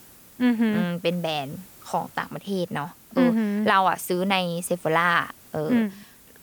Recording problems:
hiss; faint; throughout; 25 dB below the speech

